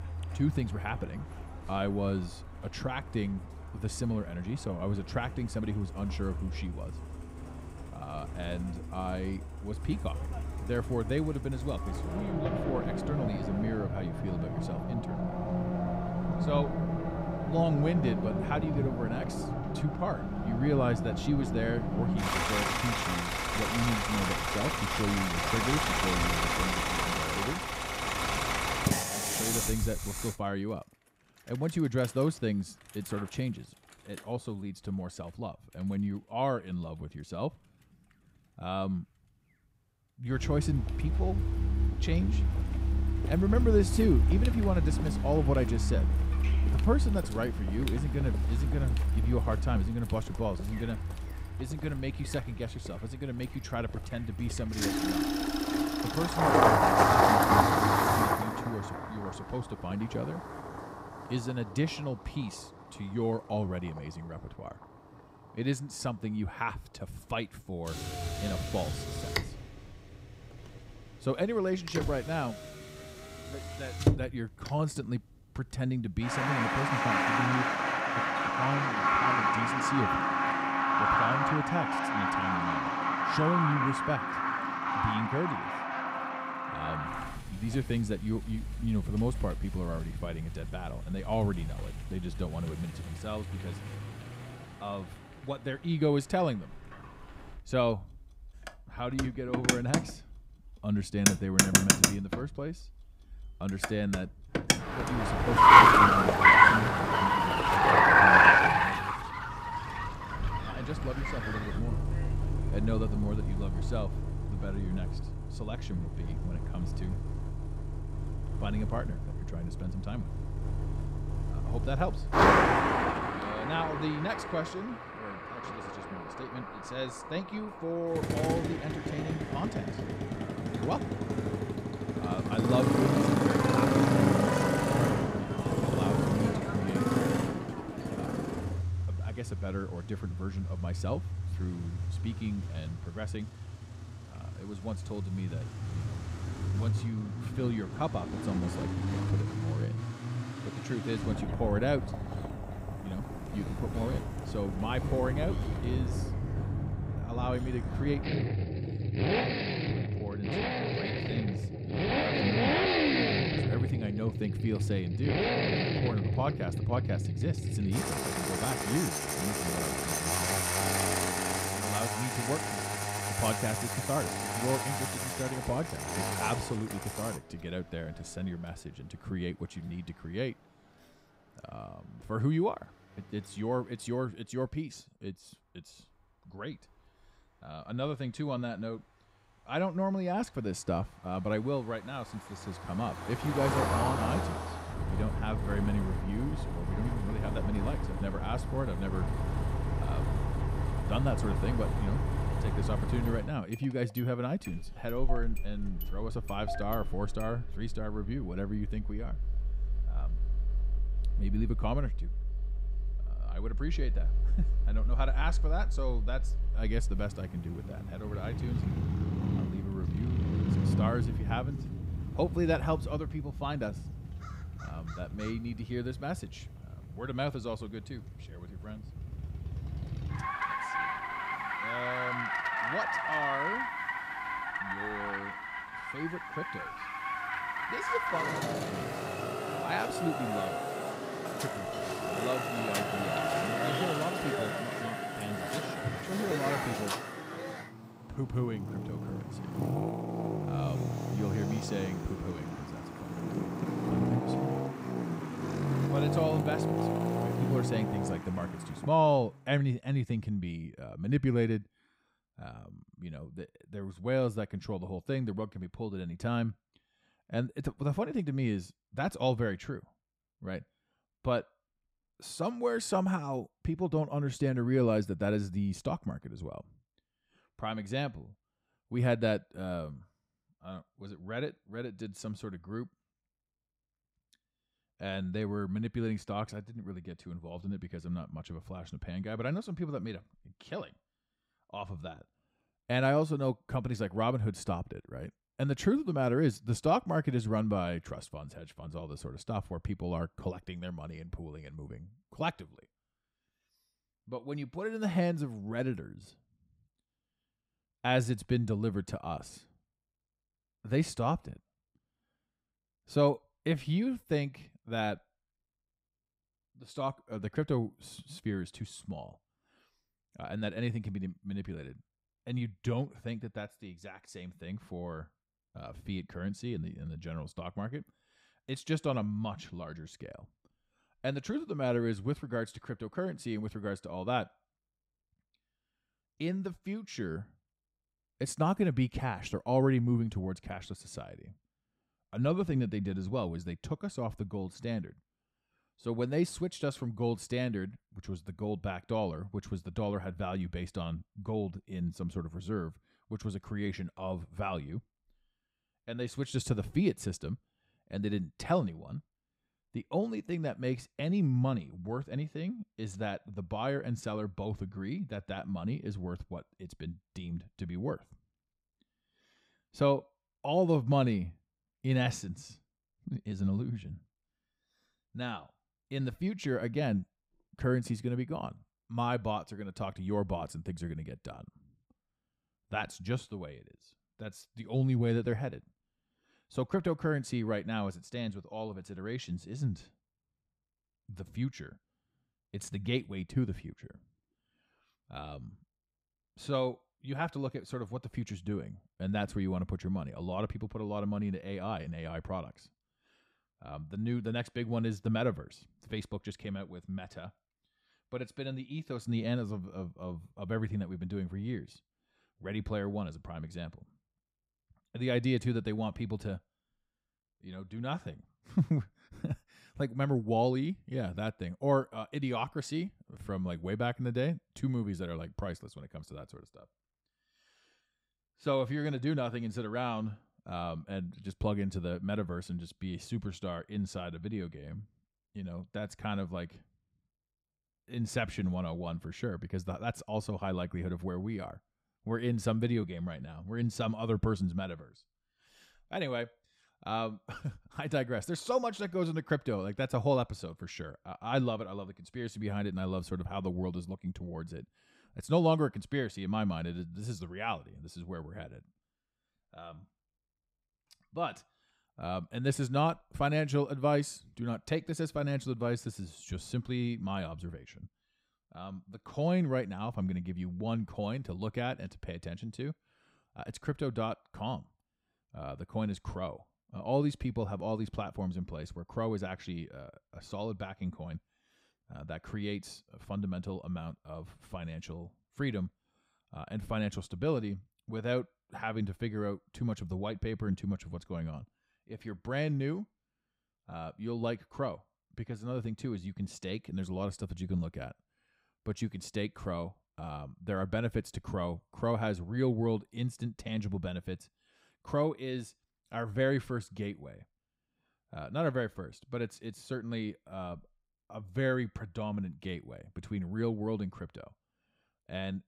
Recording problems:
traffic noise; very loud; until 4:19; 5 dB above the speech

